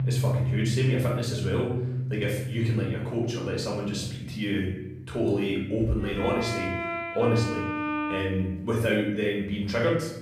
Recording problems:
off-mic speech; far
room echo; noticeable; dies away in 0.7 s
background music; loud; throughout; 4 dB below the speech

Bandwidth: 14.5 kHz